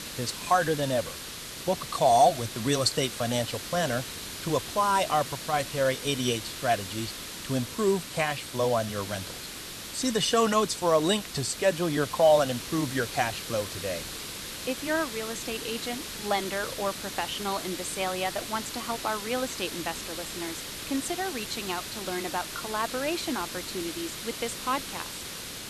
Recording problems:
hiss; loud; throughout; 7 dB below the speech

